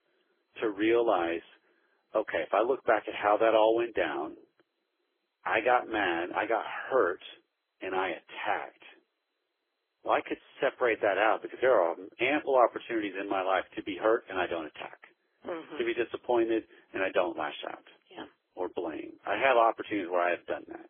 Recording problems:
phone-call audio; poor line; nothing above 3.5 kHz
garbled, watery; badly

